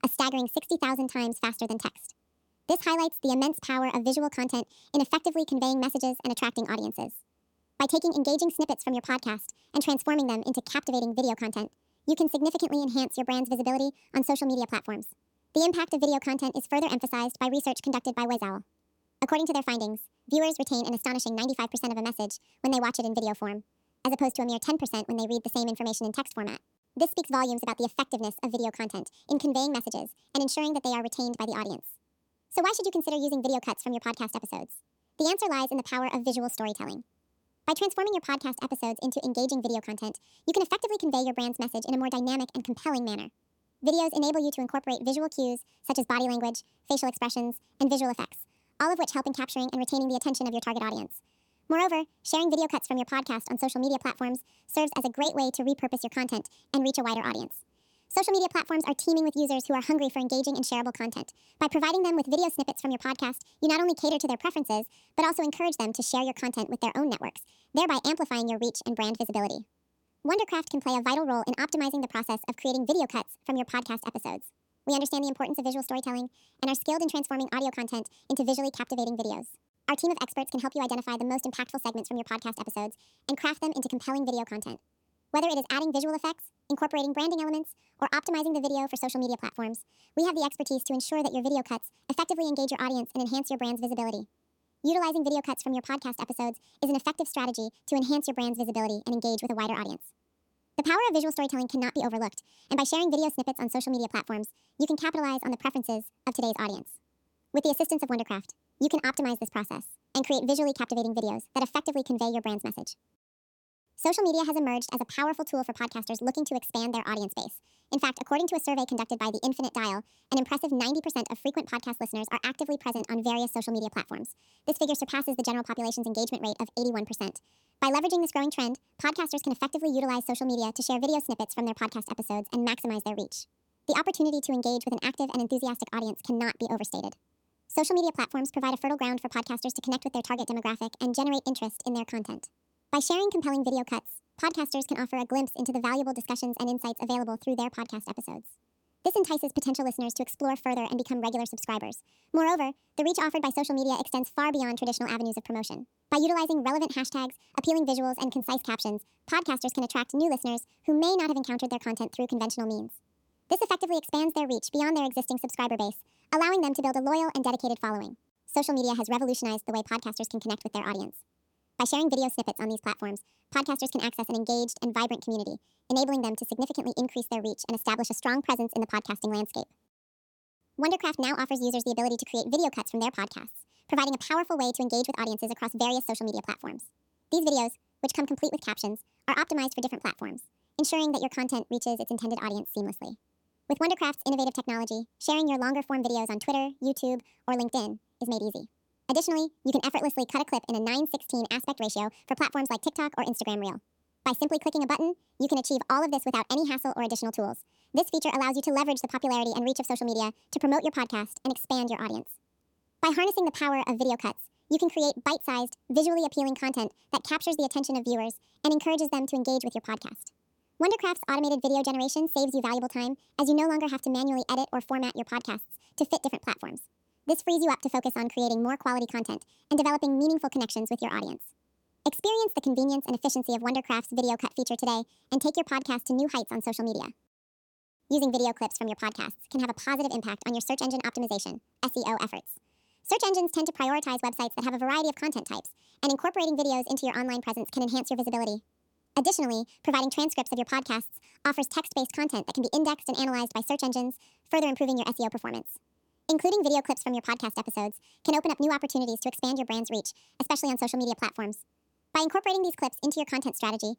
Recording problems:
wrong speed and pitch; too fast and too high; 1.5 times normal speed

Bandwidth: 18.5 kHz